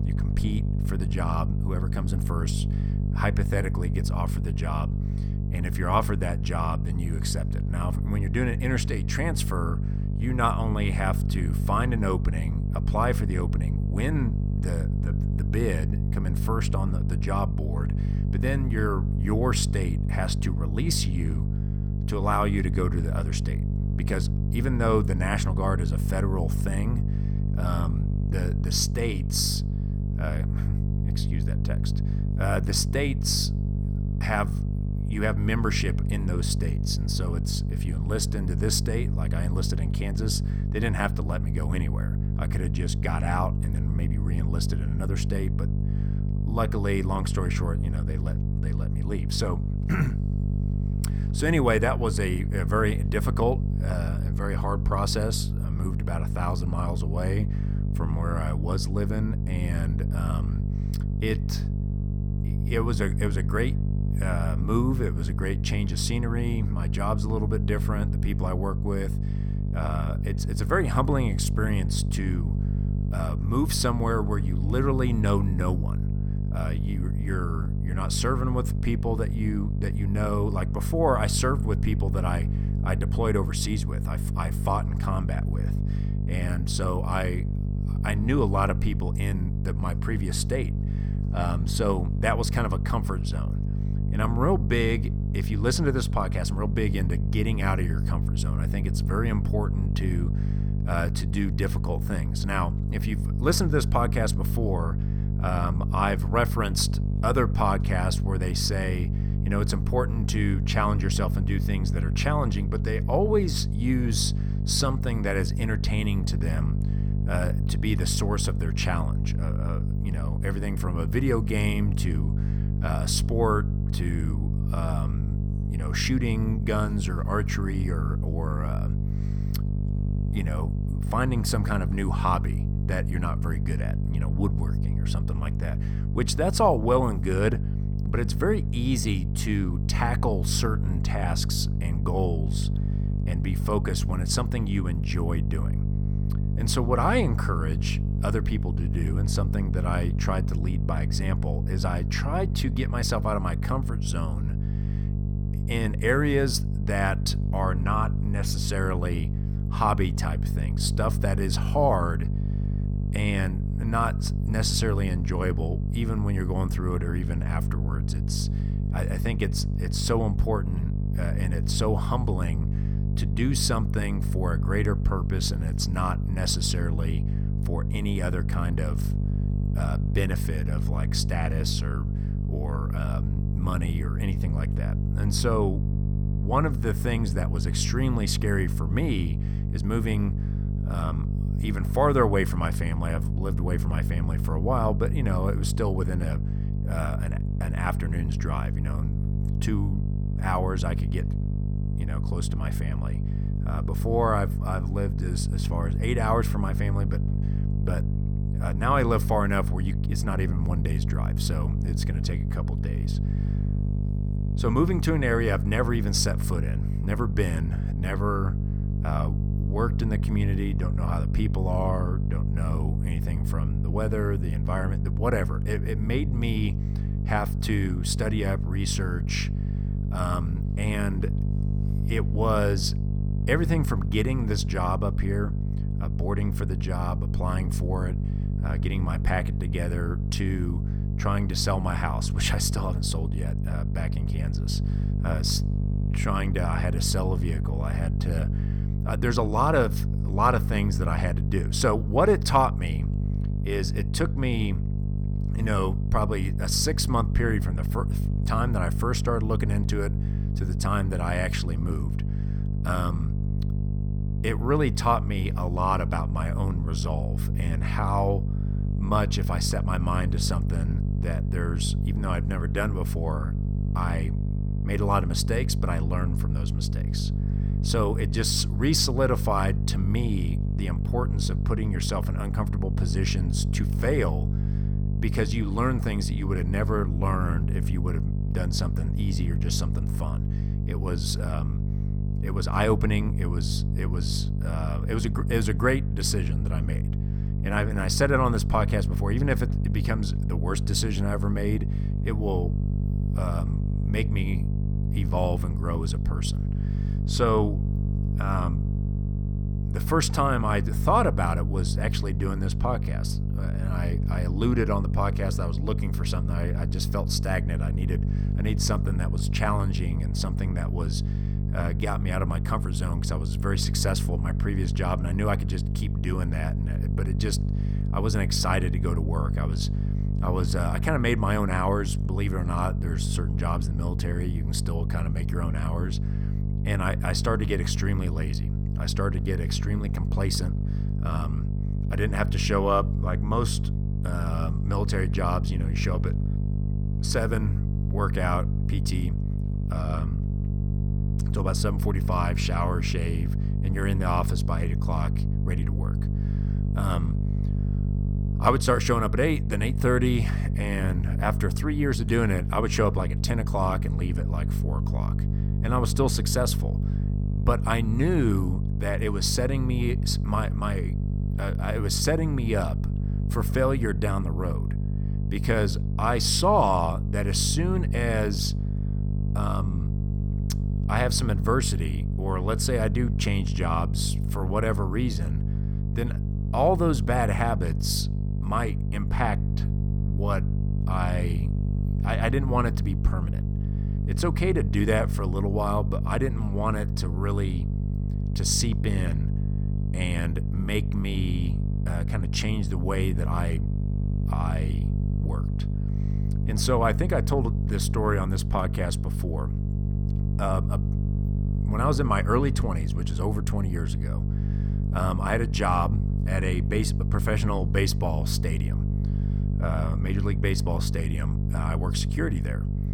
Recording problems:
electrical hum; loud; throughout; 50 Hz, 9 dB below the speech

